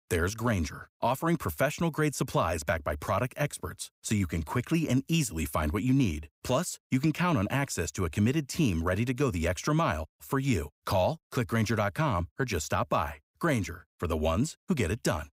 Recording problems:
none

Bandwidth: 15.5 kHz